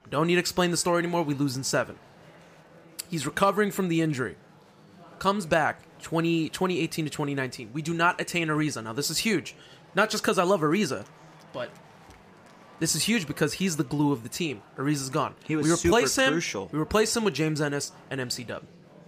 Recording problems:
murmuring crowd; faint; throughout; 25 dB below the speech

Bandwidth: 15 kHz